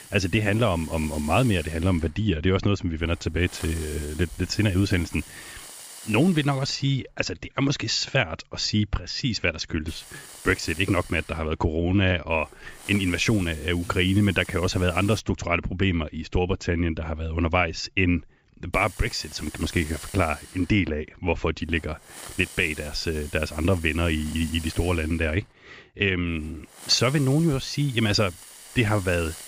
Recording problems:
high frequencies cut off; noticeable; nothing above 7.5 kHz
hiss; noticeable; until 7 s, from 10 to 15 s and from 19 s on; 15 dB below the speech

